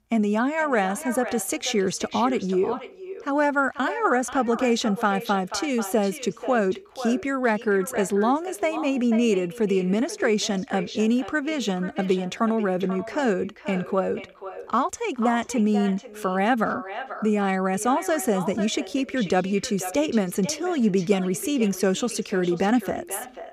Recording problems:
echo of what is said; noticeable; throughout; 490 ms later, 15 dB below the speech

